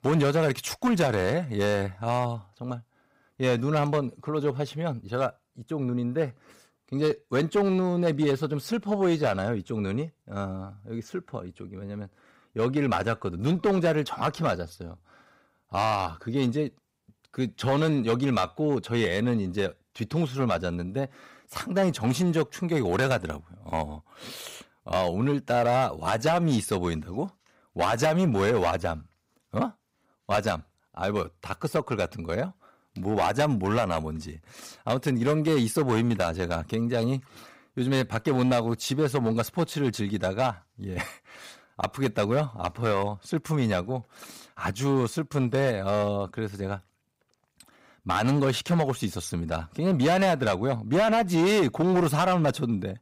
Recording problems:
distortion; slight; 6% of the sound clipped

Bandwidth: 15.5 kHz